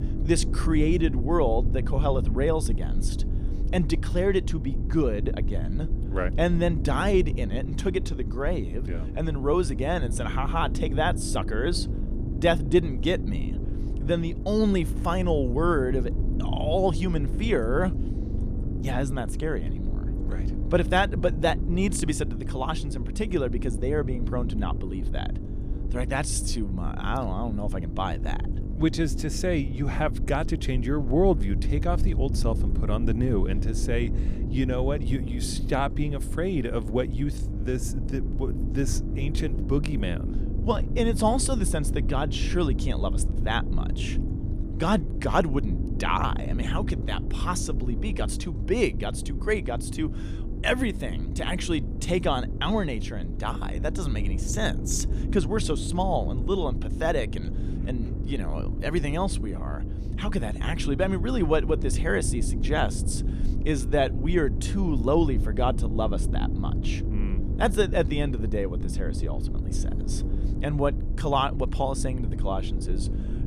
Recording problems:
low rumble; noticeable; throughout; 10 dB below the speech

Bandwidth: 15 kHz